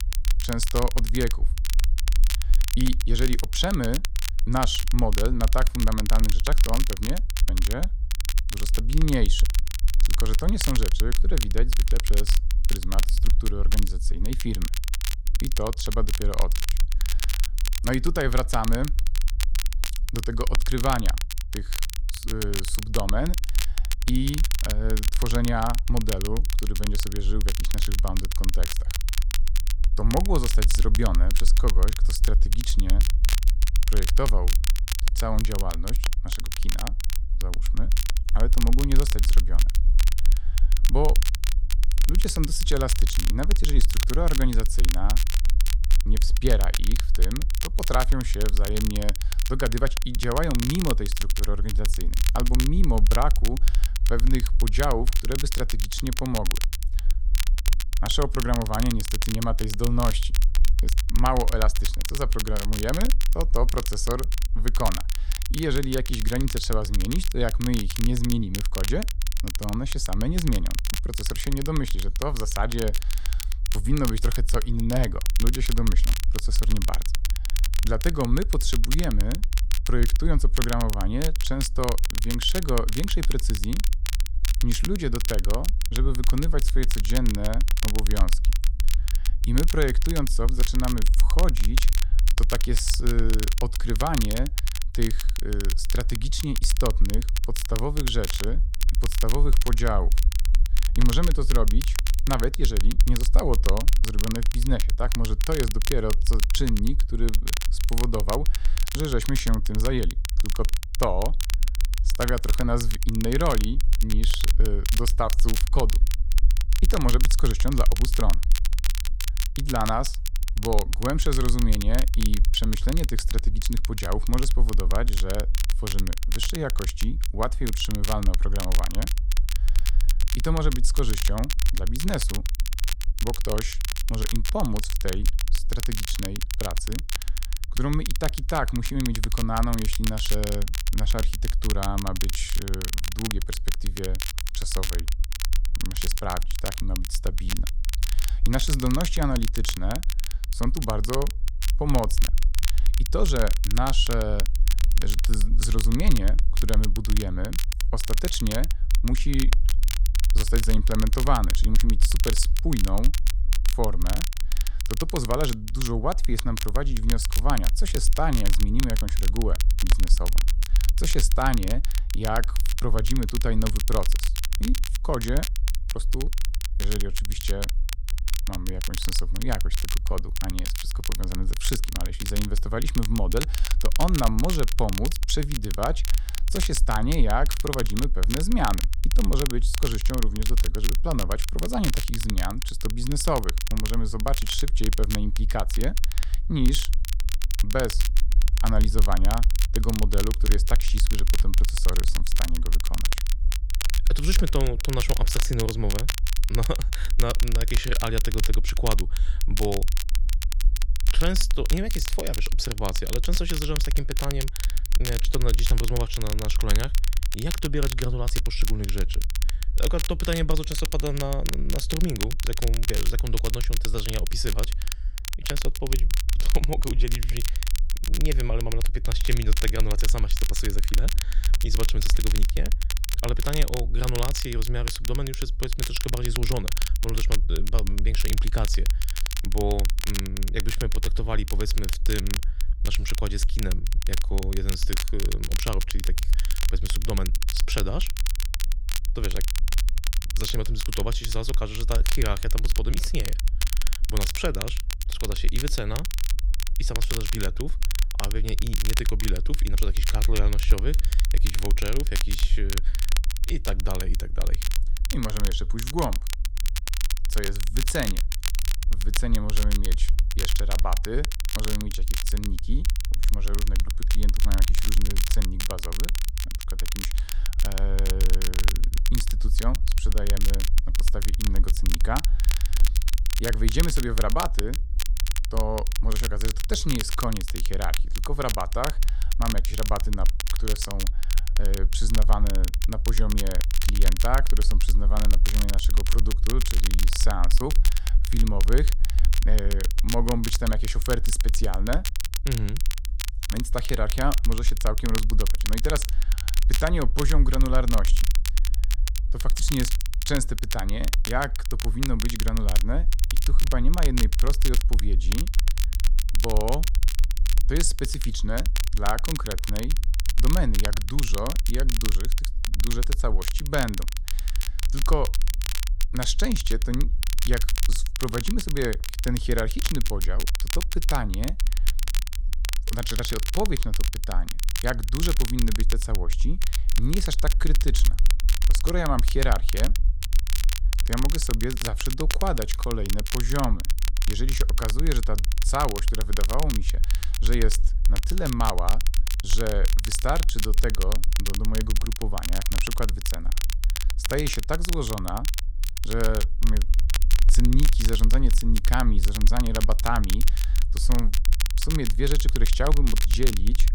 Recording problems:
crackle, like an old record; loud; 4 dB below the speech
low rumble; faint; throughout; 20 dB below the speech

